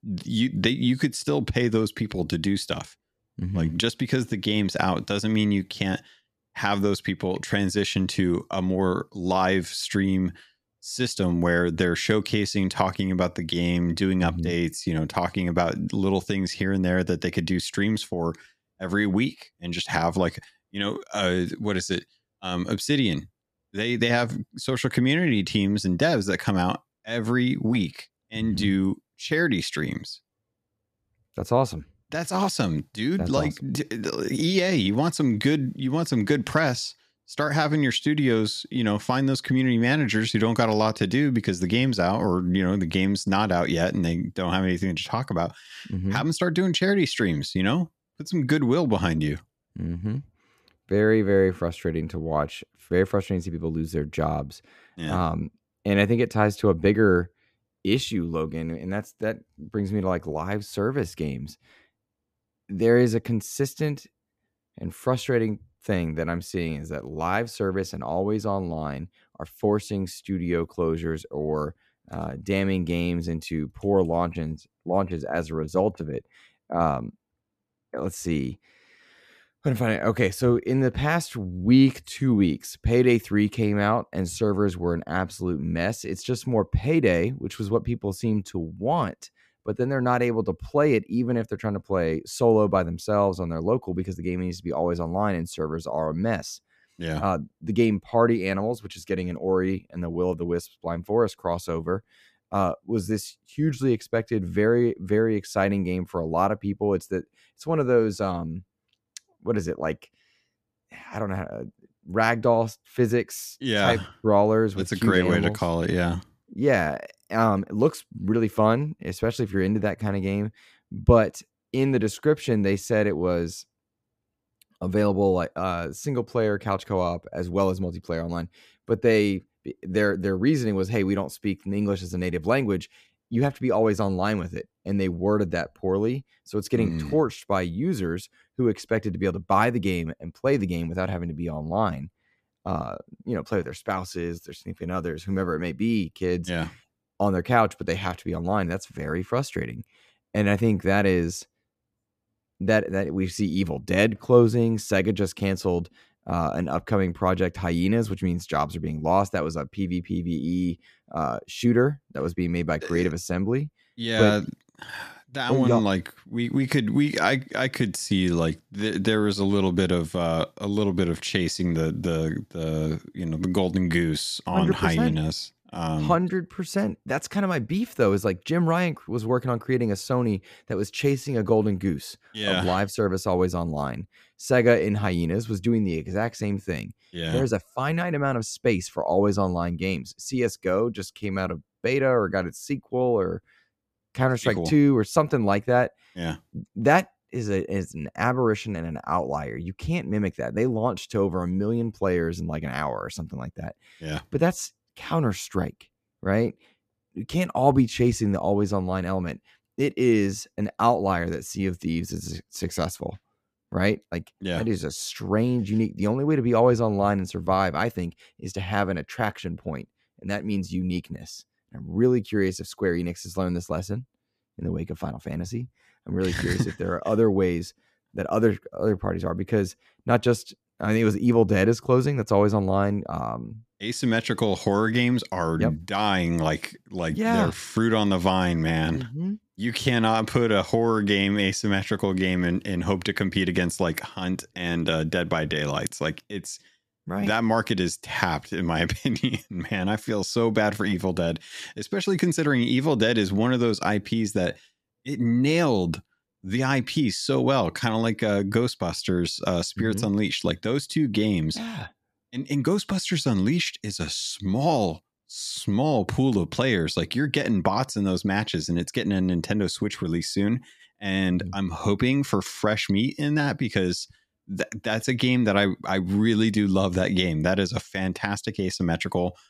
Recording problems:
none

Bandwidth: 14.5 kHz